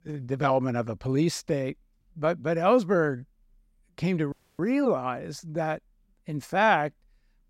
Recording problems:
audio cutting out; at 4.5 s

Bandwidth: 16 kHz